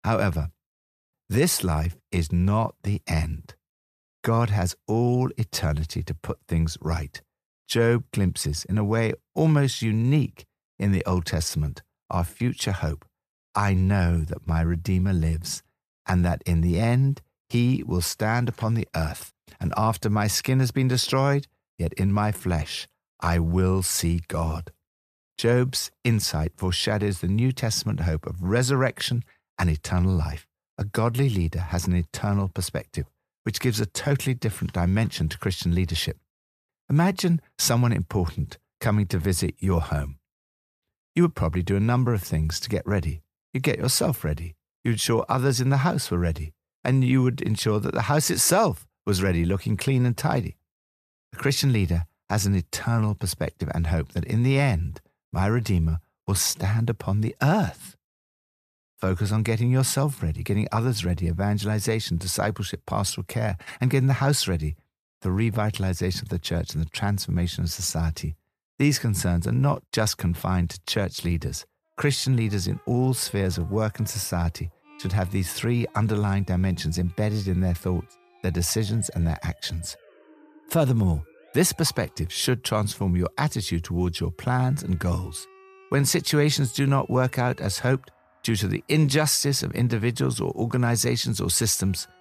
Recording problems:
background music; faint; from 1:12 on; 30 dB below the speech

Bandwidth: 14.5 kHz